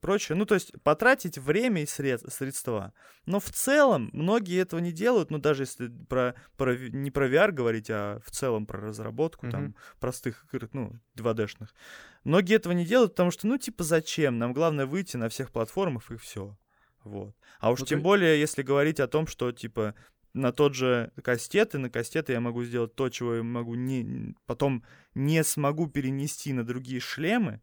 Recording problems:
none

